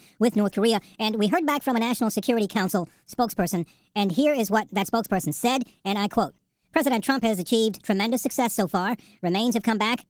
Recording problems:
wrong speed and pitch; too fast and too high; 1.5 times normal speed
garbled, watery; slightly

